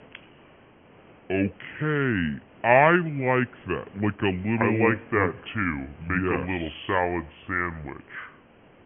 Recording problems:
high frequencies cut off; severe; nothing above 3 kHz
wrong speed and pitch; too slow and too low; 0.7 times normal speed
hiss; faint; throughout; 25 dB below the speech

